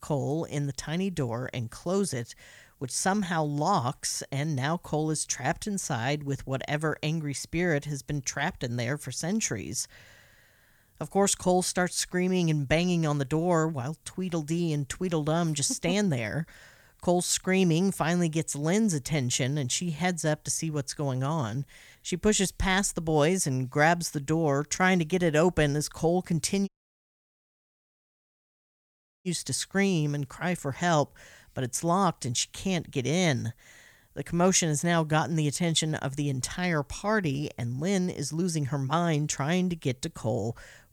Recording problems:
audio cutting out; at 27 s for 2.5 s

